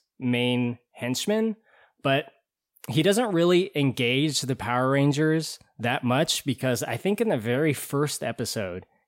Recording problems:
none

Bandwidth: 16 kHz